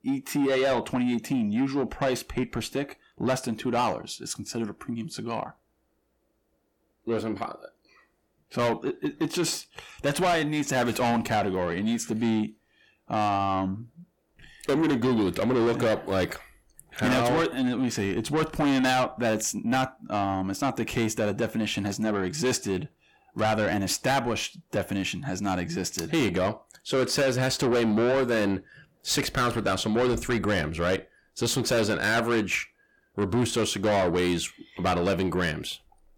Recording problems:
distortion; heavy; 7 dB below the speech

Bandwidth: 17.5 kHz